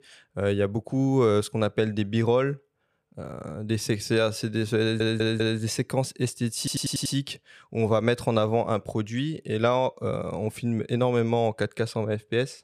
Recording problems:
audio stuttering; at 5 s and at 6.5 s

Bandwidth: 15 kHz